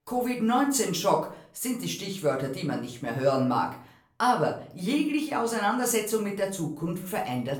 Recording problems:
off-mic speech; far
room echo; slight; dies away in 0.4 s

